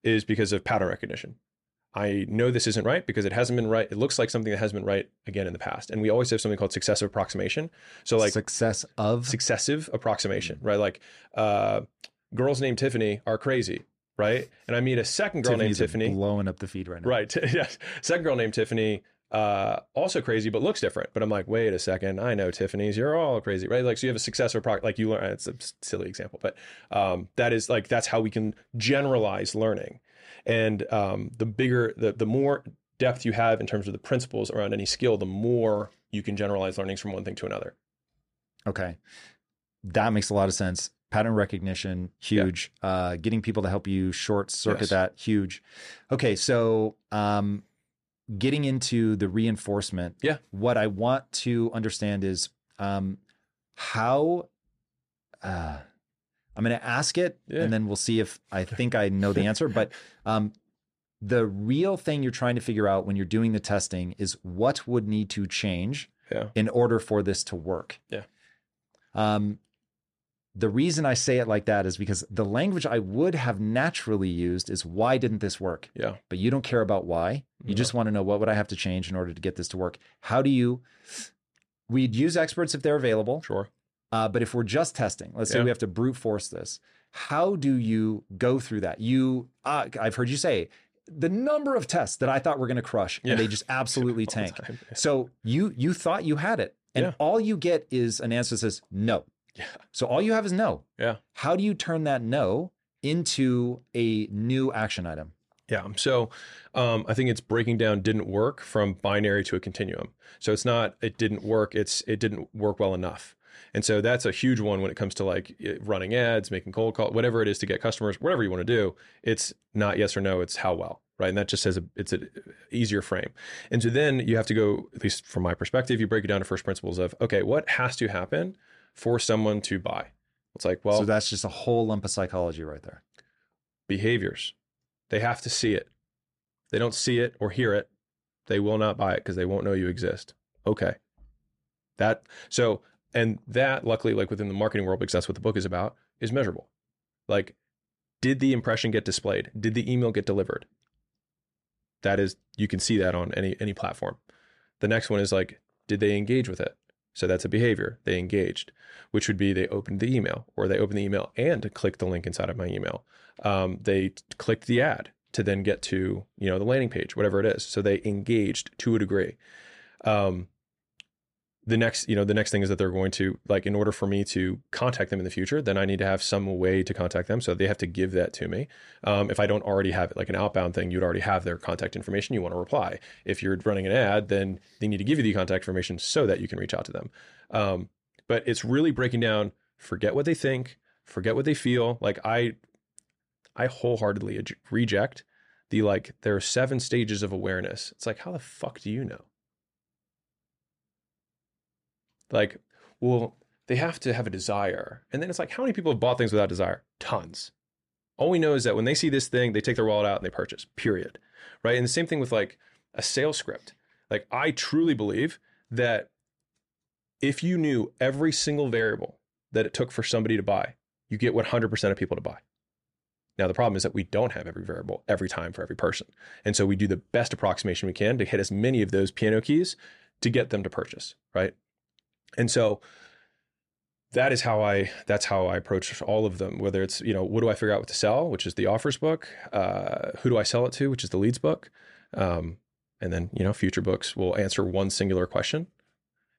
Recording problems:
none

